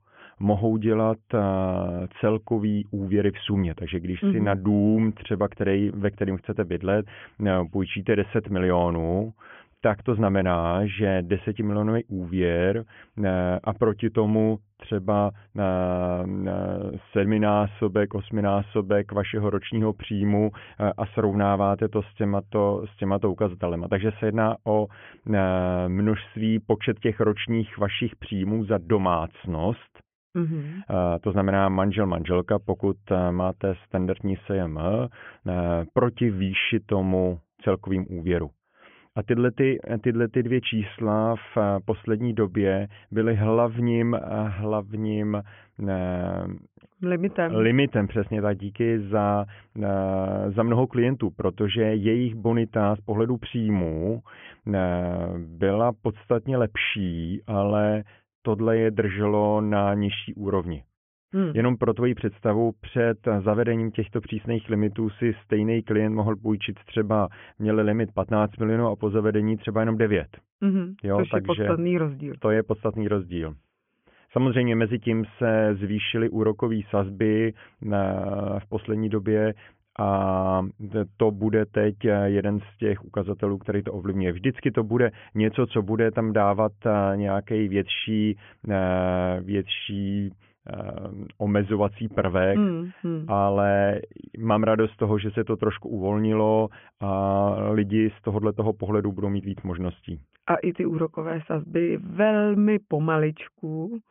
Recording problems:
high frequencies cut off; severe; nothing above 3.5 kHz

